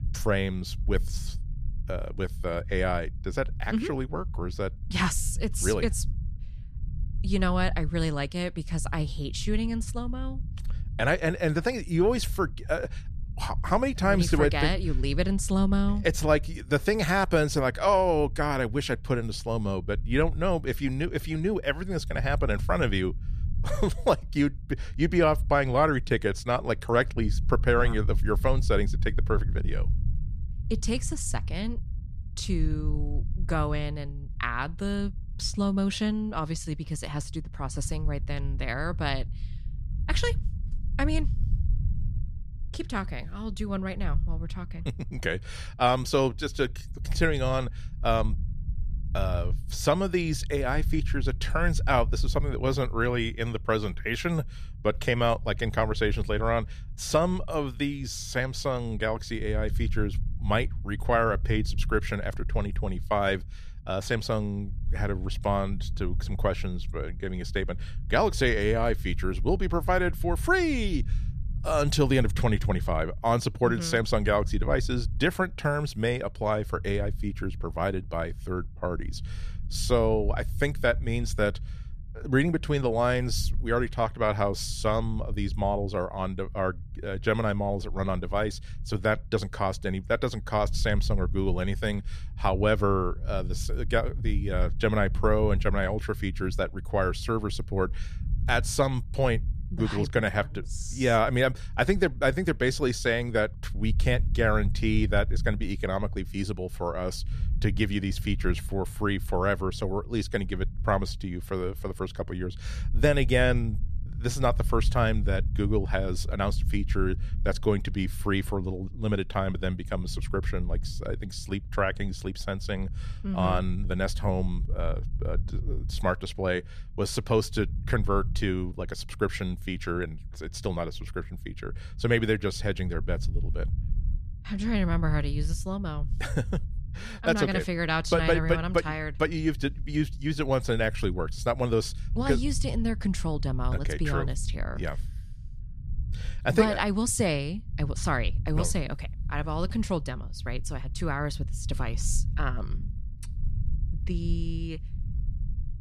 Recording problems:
low rumble; faint; throughout; 25 dB below the speech

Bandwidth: 14.5 kHz